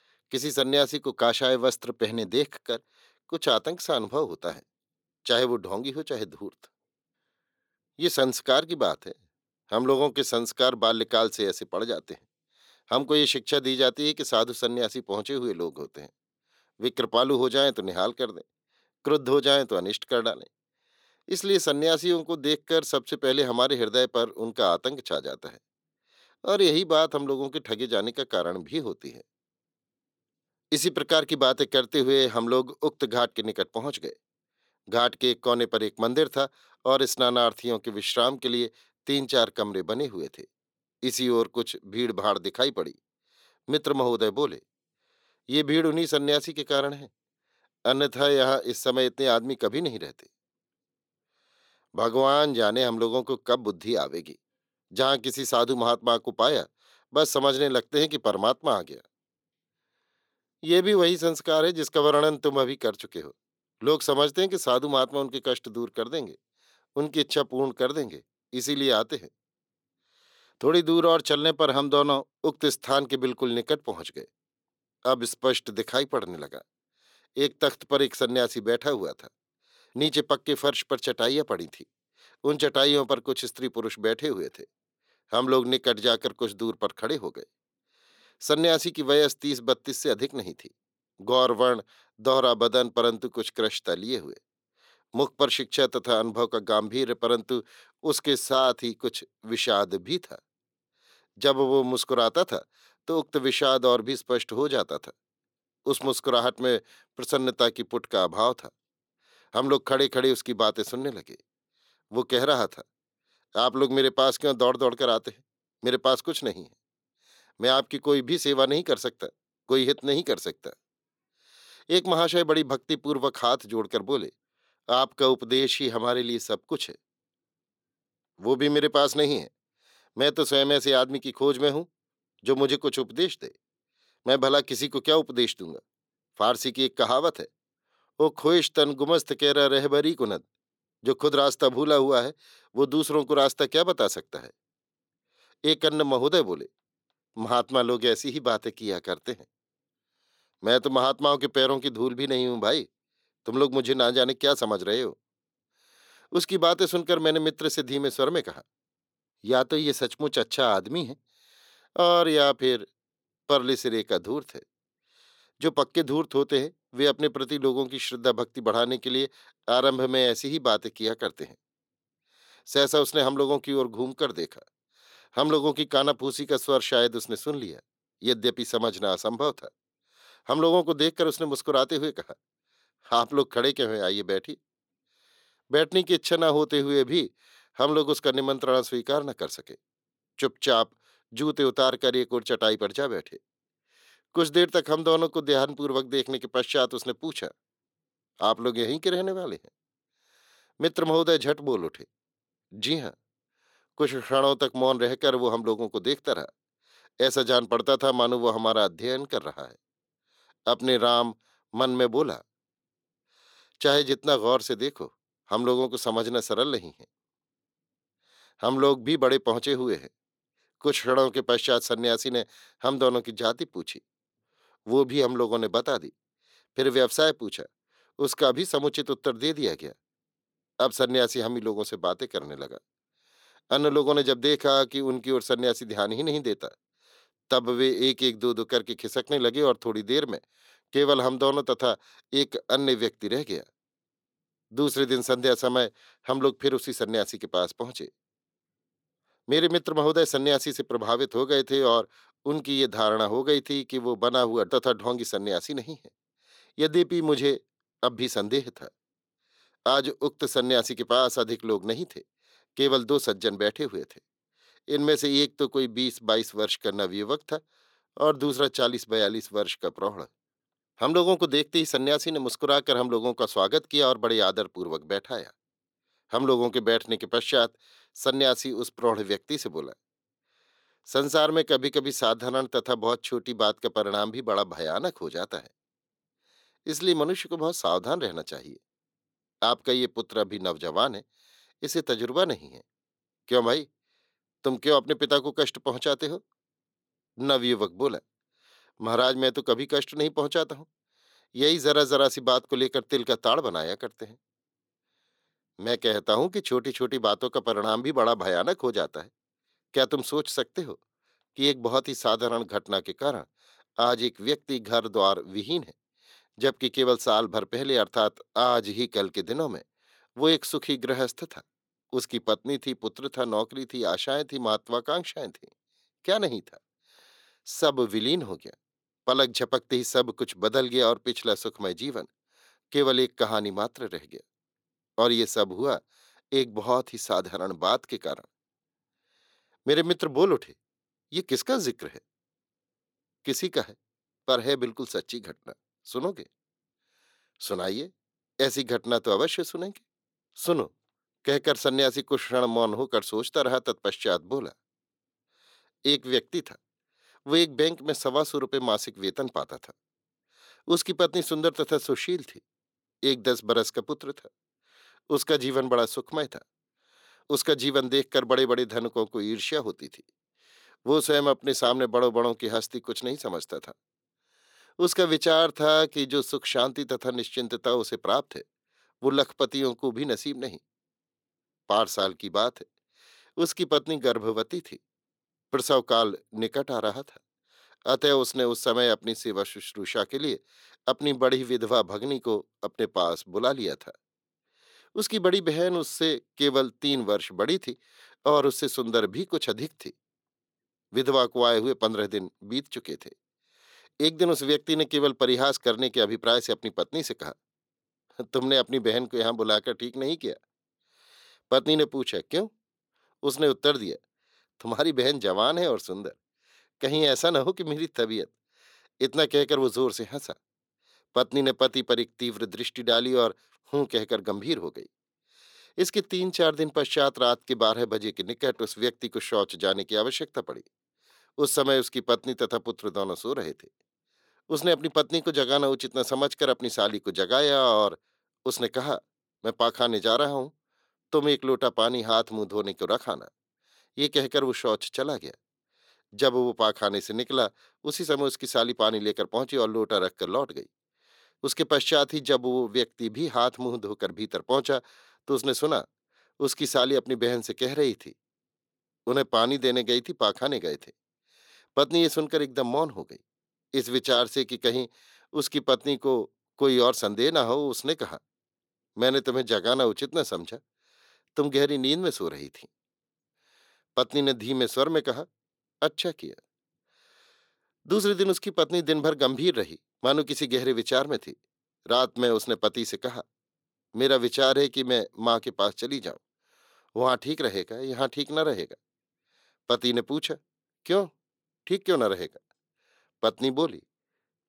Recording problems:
thin; somewhat; fading below 350 Hz

